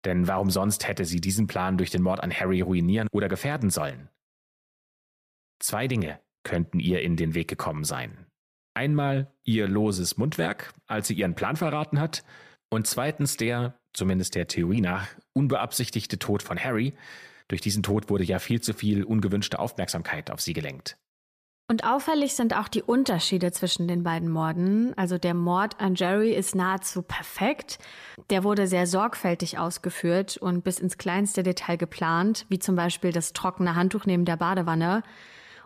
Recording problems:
none

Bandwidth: 14.5 kHz